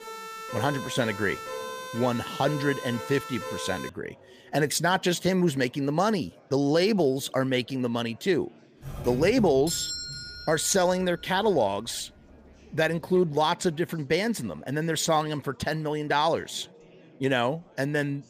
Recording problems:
chatter from many people; faint; throughout; 30 dB below the speech
siren; noticeable; until 4 s; peak 9 dB below the speech
doorbell; noticeable; from 9 to 11 s; peak 3 dB below the speech

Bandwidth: 15 kHz